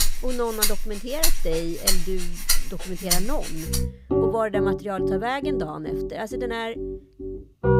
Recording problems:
background music; very loud; throughout; 3 dB above the speech

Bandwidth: 15.5 kHz